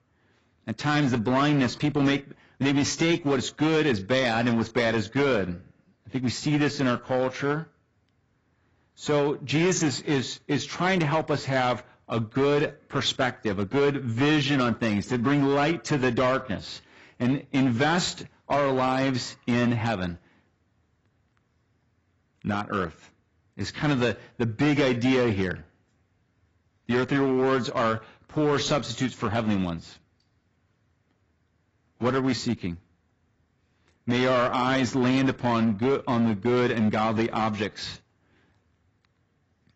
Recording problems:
garbled, watery; badly; nothing above 7.5 kHz
distortion; slight; 7% of the sound clipped

